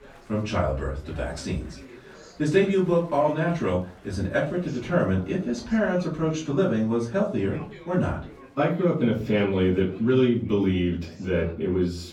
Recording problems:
off-mic speech; far
room echo; slight; dies away in 0.3 s
chatter from many people; faint; throughout; 25 dB below the speech

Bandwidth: 17 kHz